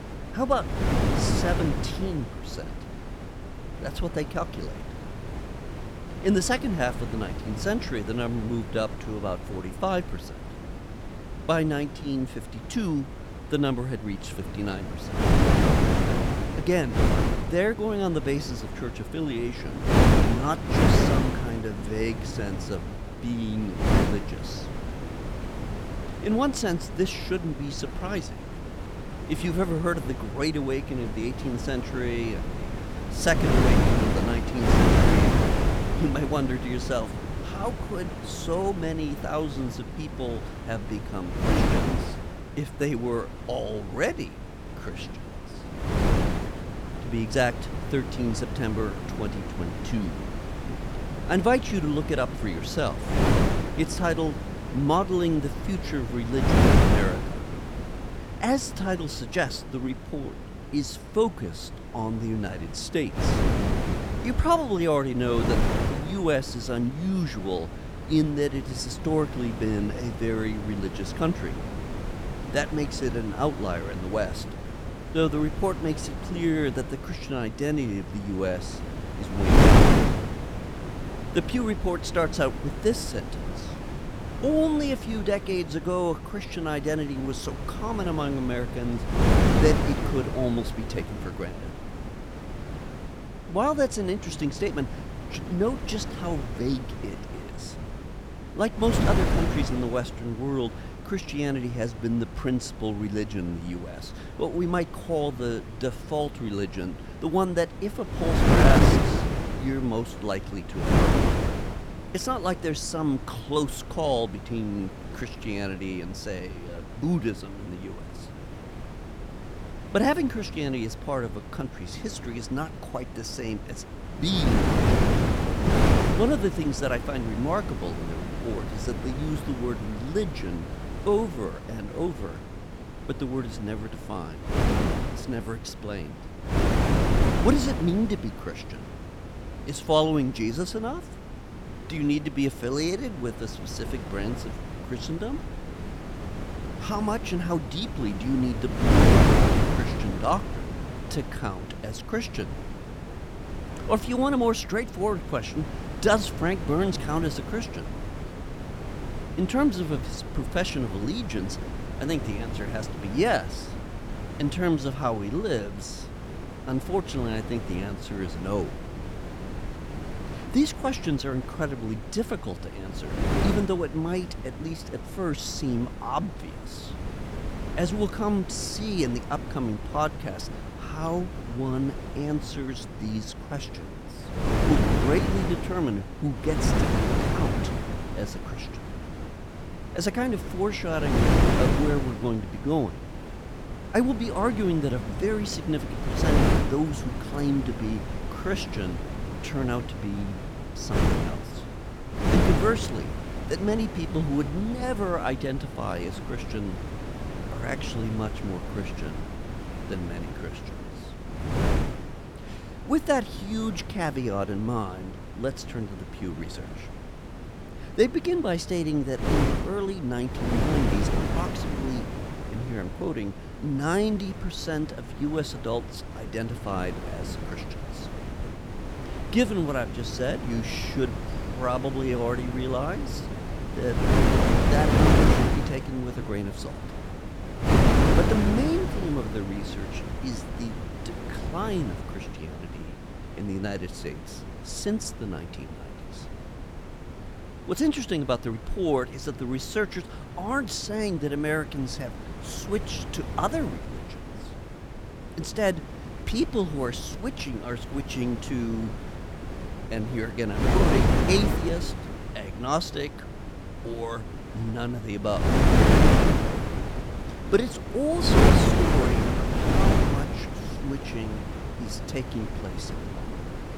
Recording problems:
wind noise on the microphone; heavy; 2 dB below the speech

